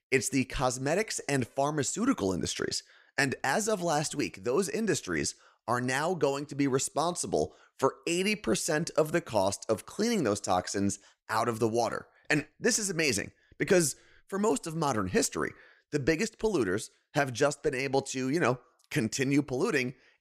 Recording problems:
none

